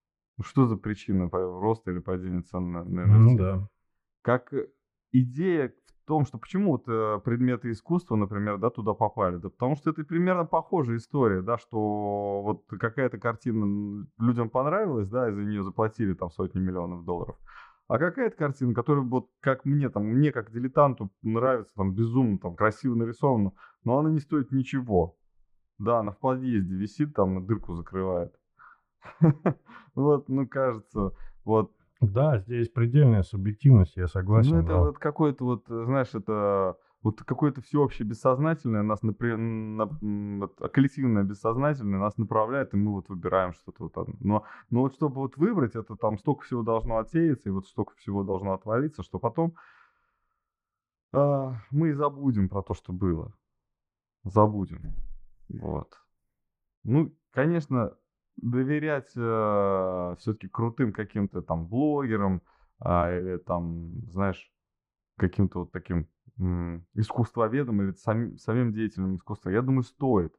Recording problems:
muffled; very; fading above 3 kHz

